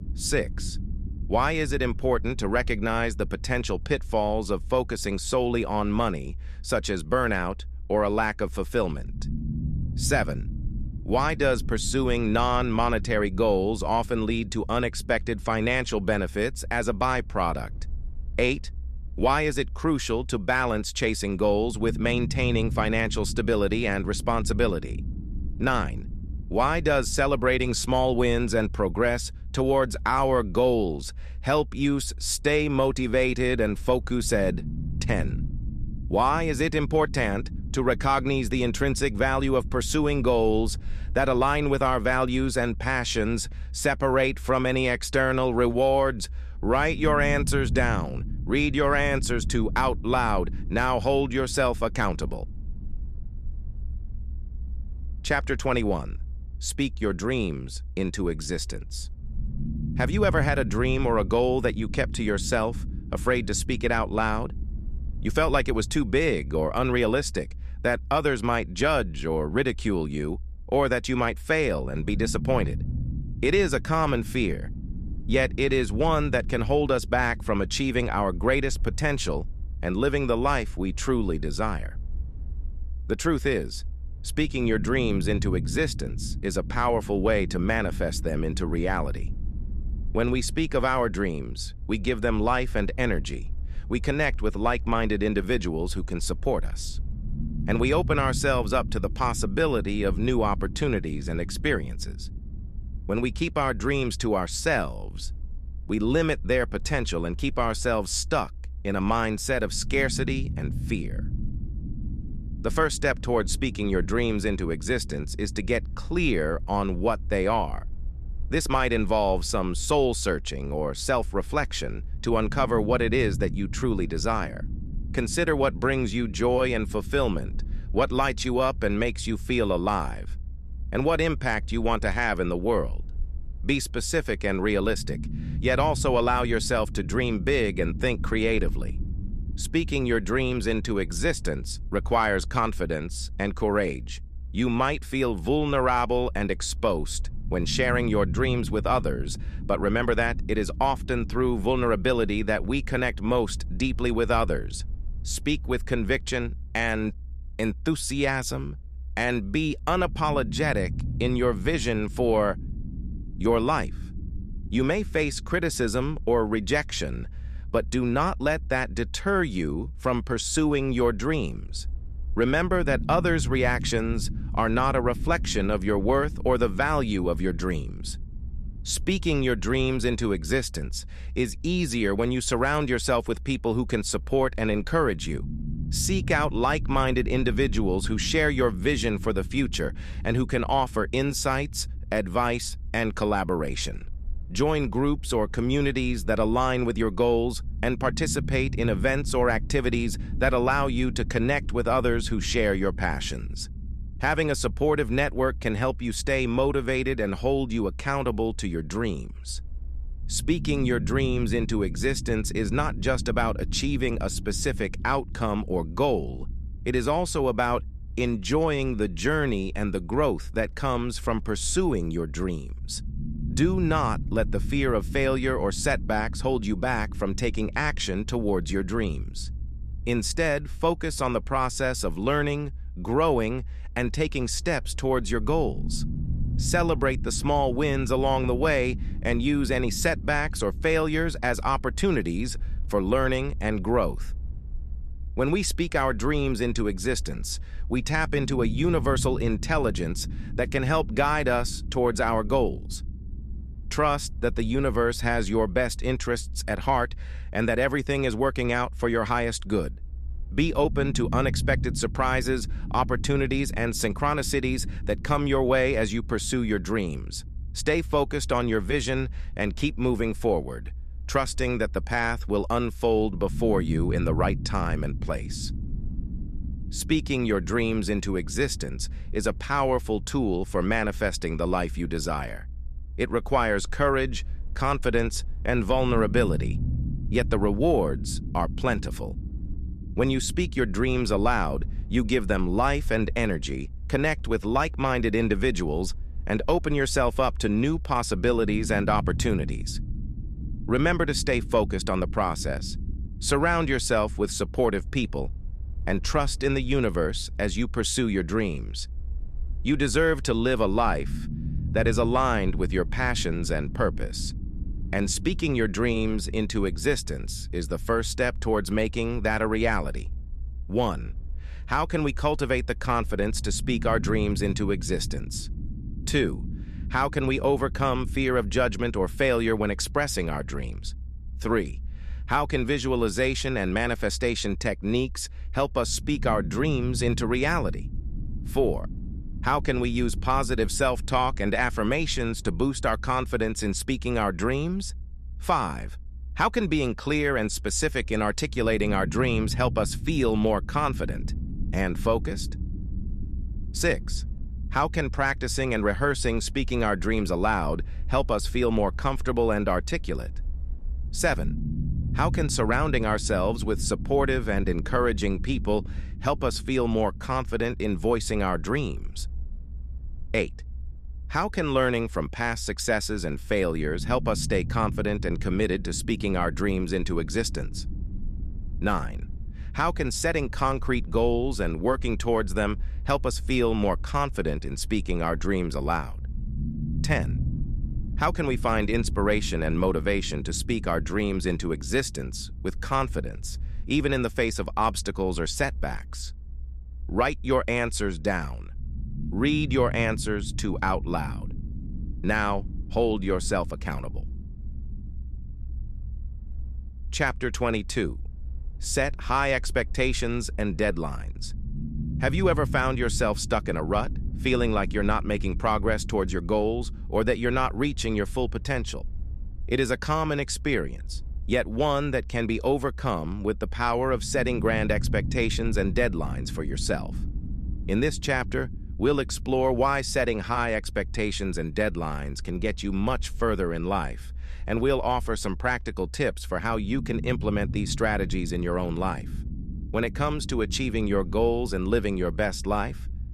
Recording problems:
low rumble; faint; throughout; 20 dB below the speech

